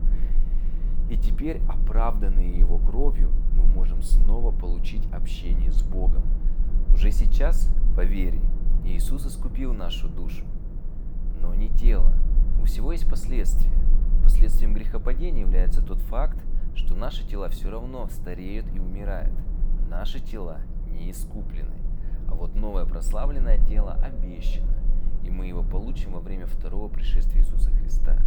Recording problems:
echo of what is said; faint; from 22 s on; 280 ms later, 20 dB below the speech
low rumble; loud; throughout; 9 dB below the speech
electrical hum; faint; throughout; 60 Hz, 25 dB below the speech

